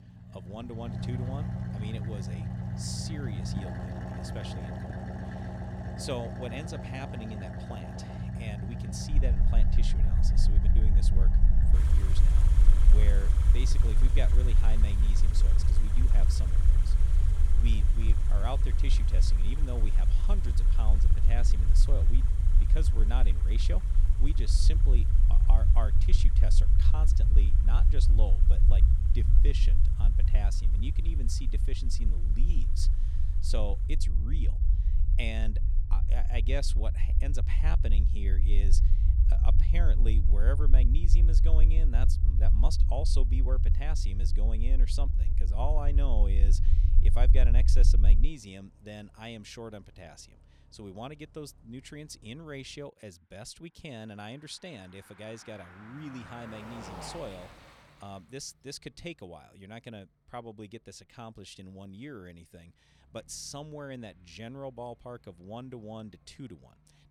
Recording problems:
traffic noise; very loud; throughout; 3 dB above the speech
low rumble; loud; from 9 to 48 s; 5 dB below the speech

